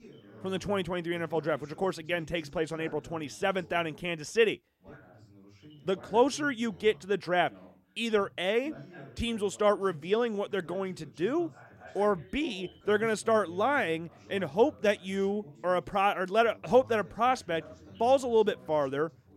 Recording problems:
background chatter; faint; throughout; 2 voices, 20 dB below the speech

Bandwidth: 16 kHz